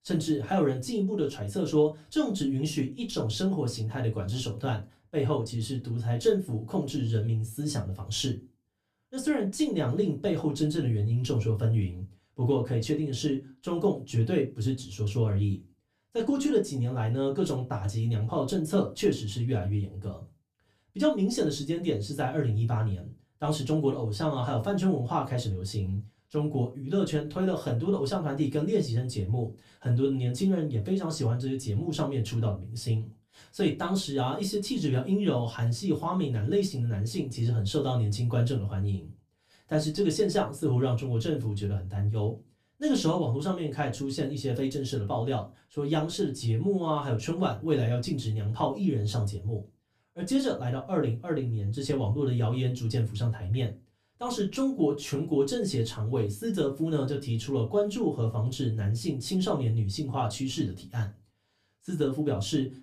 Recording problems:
off-mic speech; far
room echo; very slight; dies away in 0.2 s

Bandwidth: 15 kHz